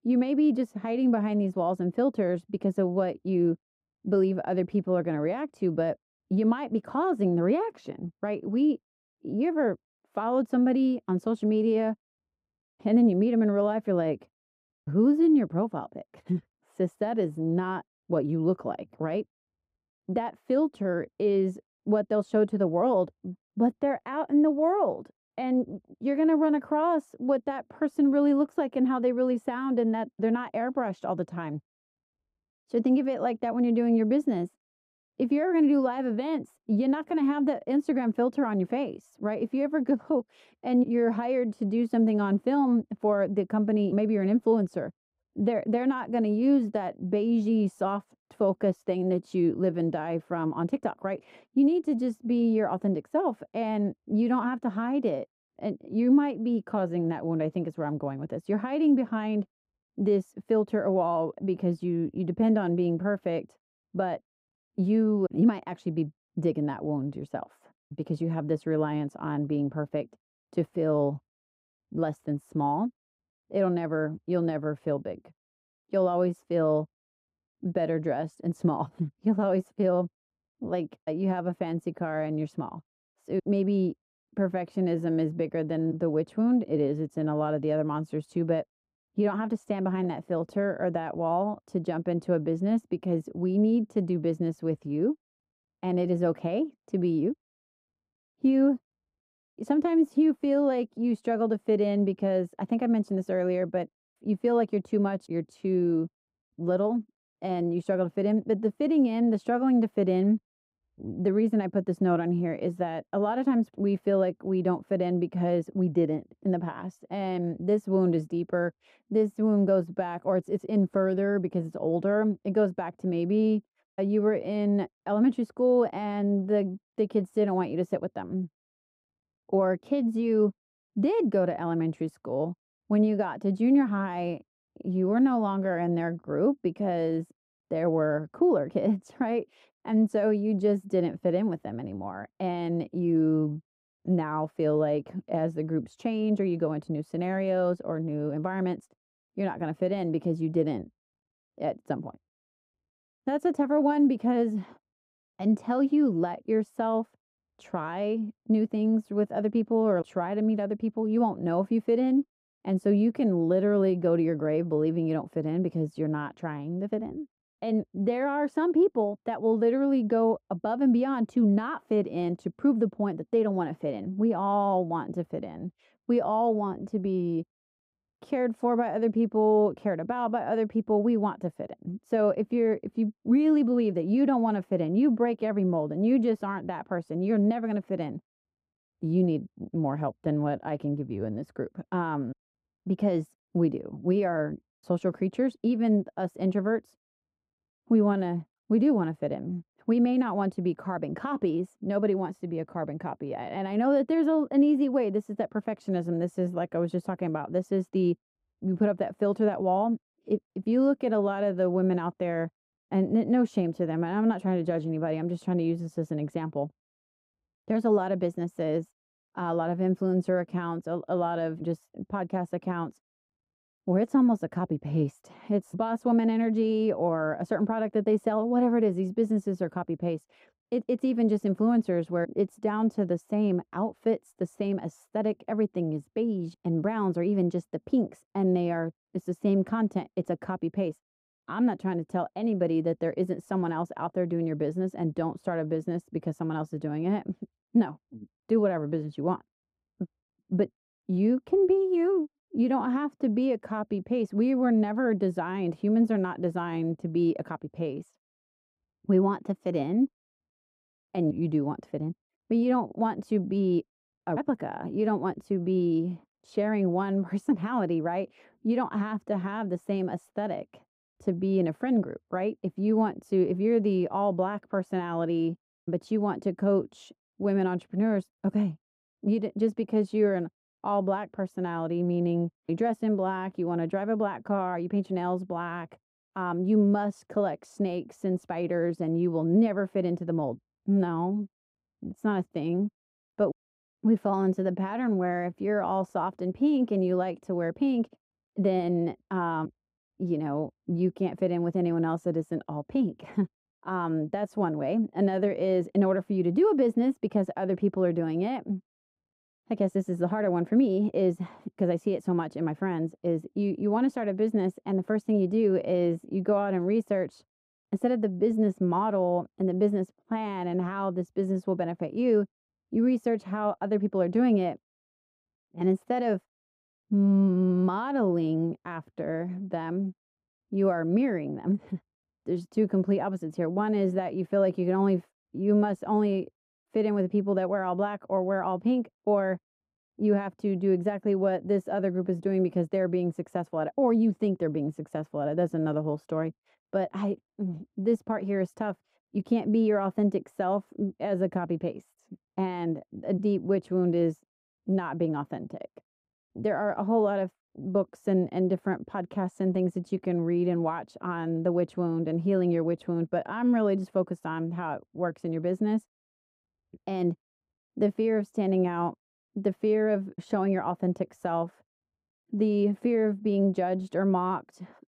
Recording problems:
muffled; very; fading above 1.5 kHz

